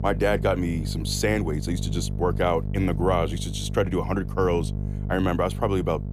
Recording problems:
electrical hum; noticeable; throughout; 50 Hz, 15 dB below the speech

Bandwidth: 15 kHz